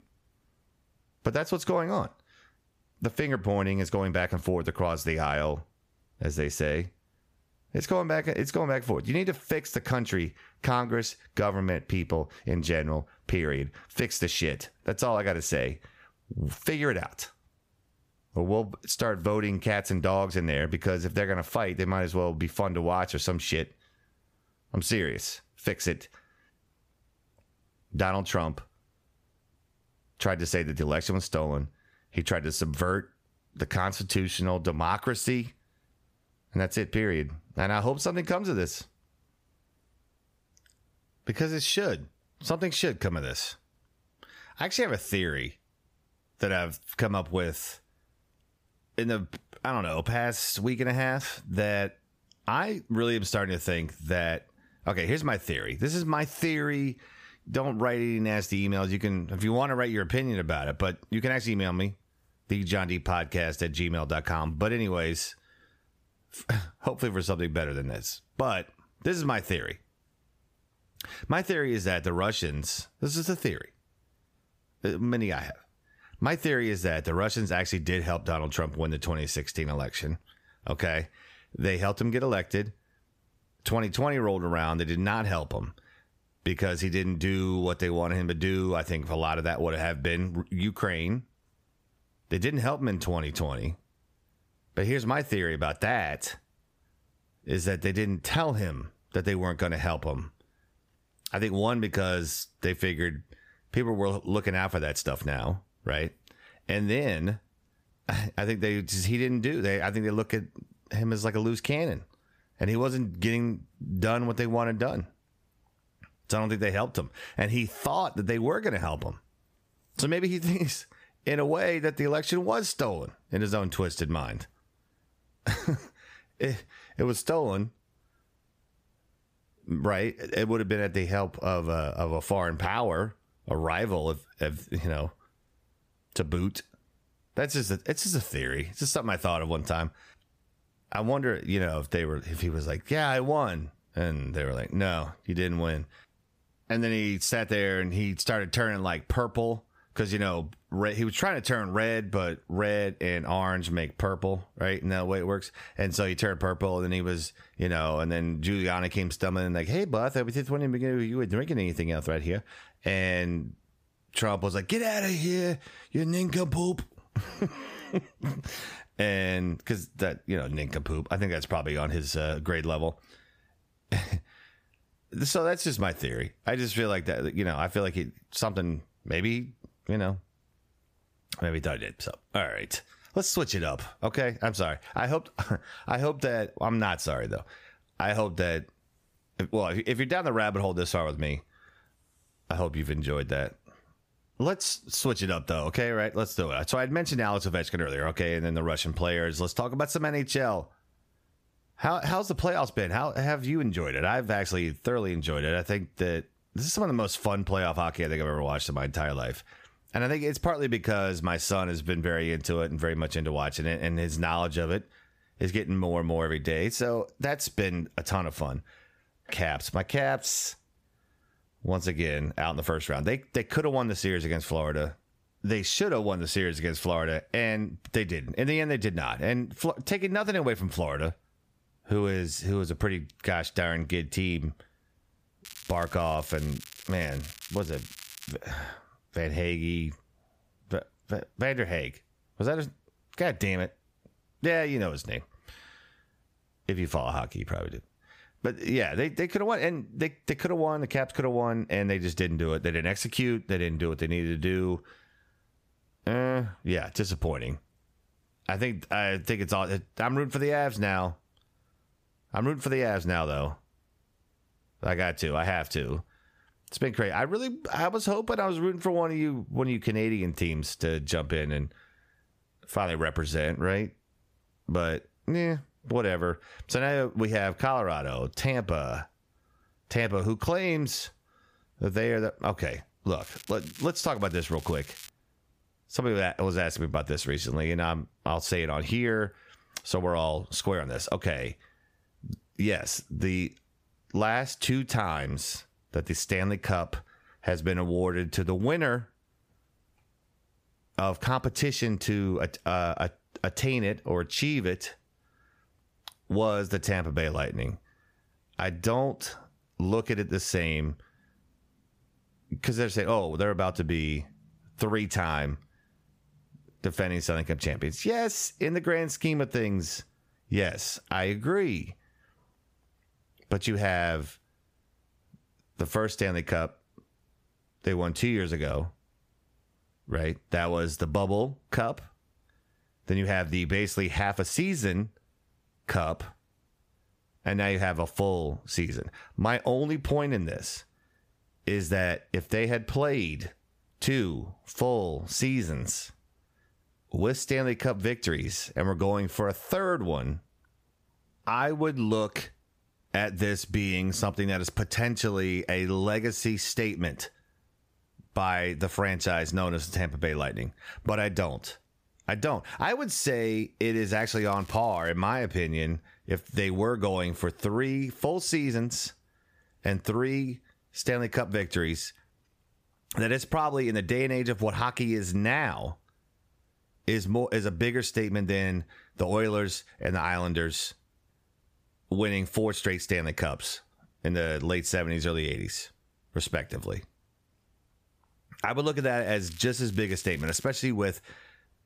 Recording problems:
squashed, flat; somewhat
crackling; noticeable; 4 times, first at 3:55; 15 dB below the speech

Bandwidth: 15 kHz